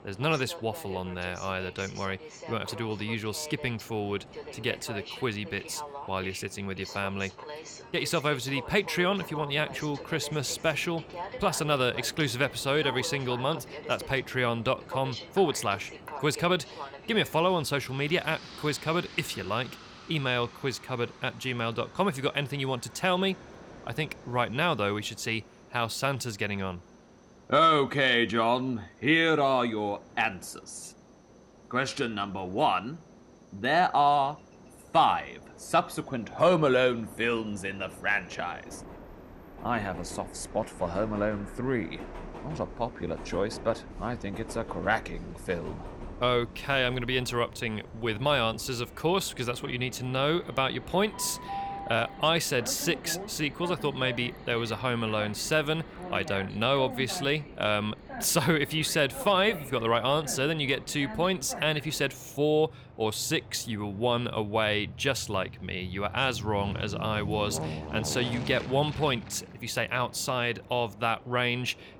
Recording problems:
train or aircraft noise; noticeable; throughout; 15 dB below the speech

